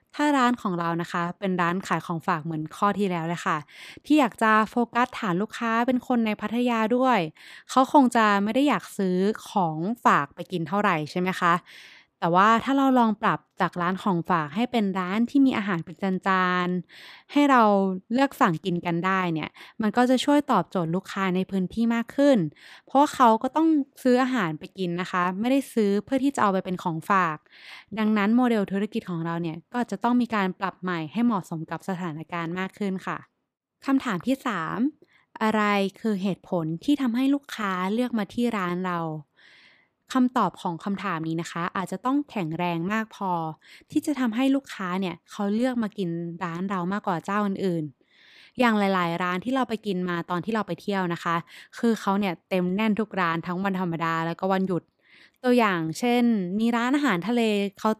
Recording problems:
none

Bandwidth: 15 kHz